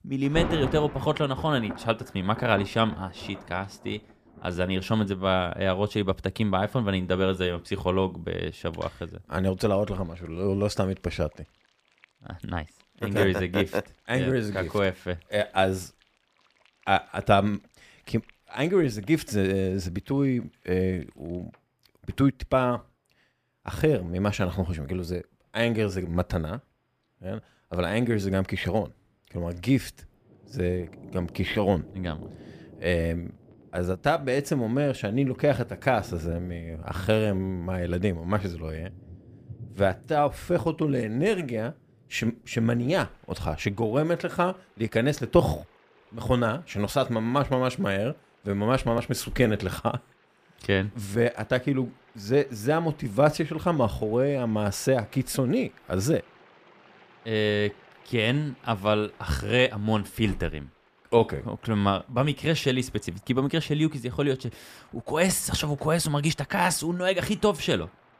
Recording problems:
rain or running water; noticeable; throughout; 20 dB below the speech

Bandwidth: 15 kHz